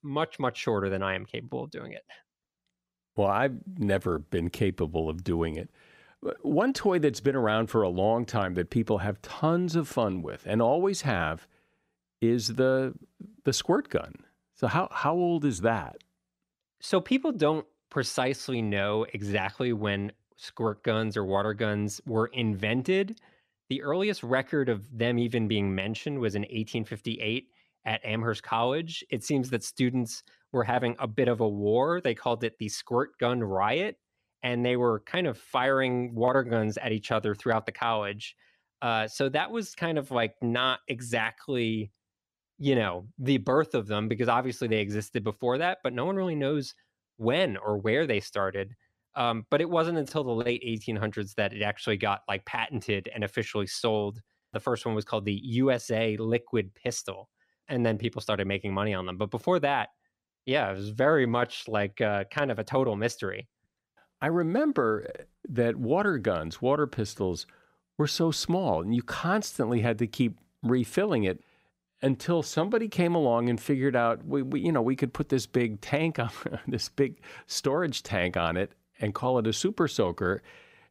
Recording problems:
none

